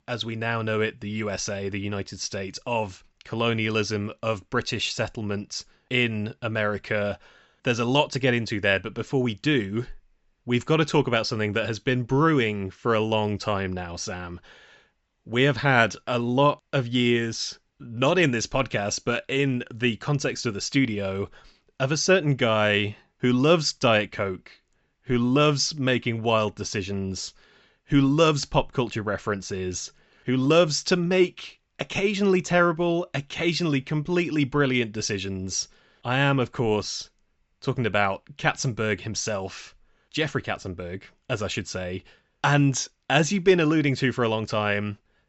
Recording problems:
high frequencies cut off; noticeable; nothing above 7.5 kHz

